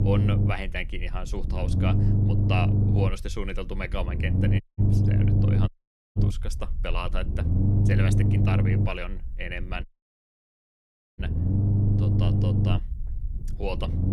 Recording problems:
low rumble; loud; throughout; as loud as the speech
audio cutting out; at 4.5 s, at 5.5 s and at 10 s for 1.5 s

